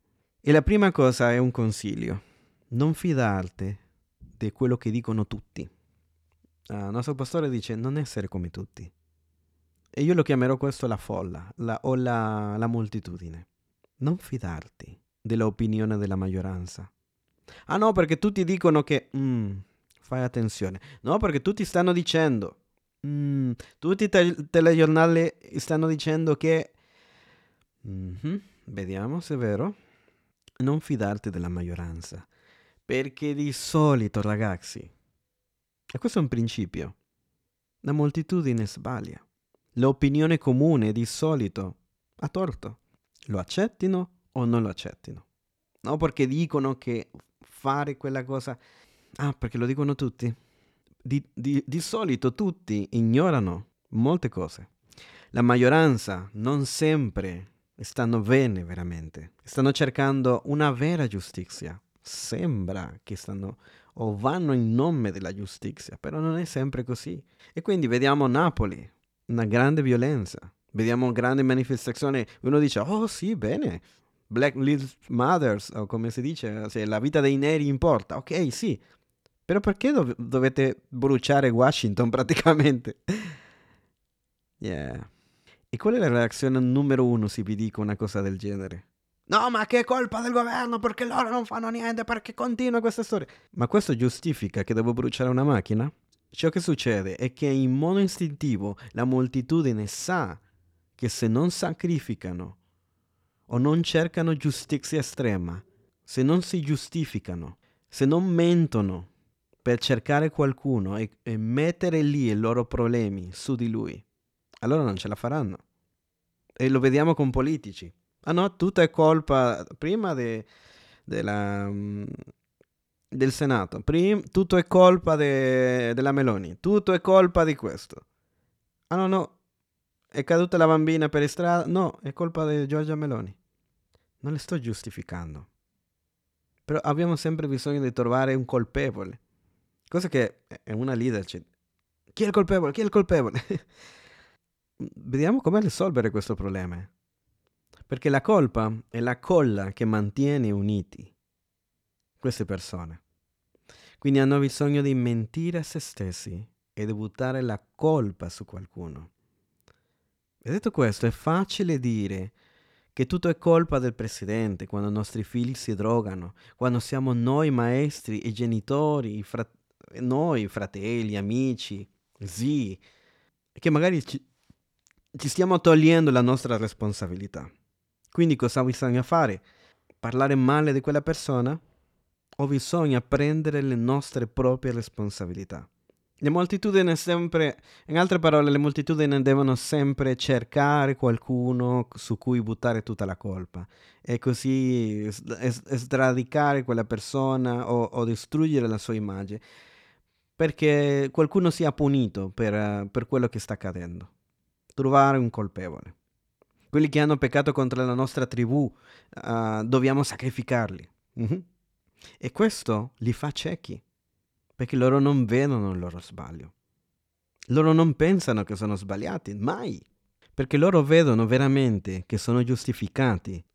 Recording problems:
none

